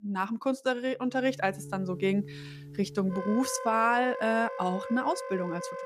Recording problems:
background music; noticeable; from 1.5 s on; 10 dB below the speech

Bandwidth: 15 kHz